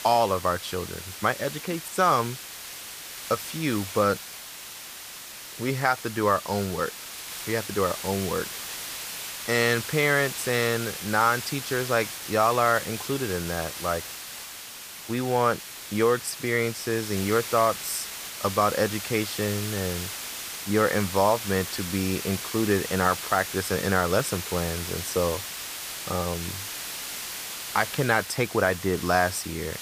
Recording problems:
hiss; loud; throughout; 8 dB below the speech

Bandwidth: 15 kHz